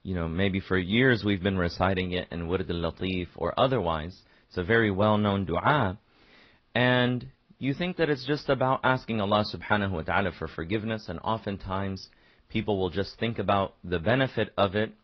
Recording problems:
high frequencies cut off; noticeable; nothing above 5.5 kHz
garbled, watery; slightly

